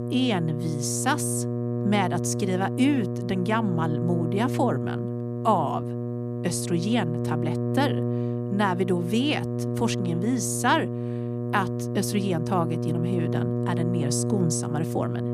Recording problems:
electrical hum; loud; throughout; 60 Hz, 6 dB below the speech

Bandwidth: 14.5 kHz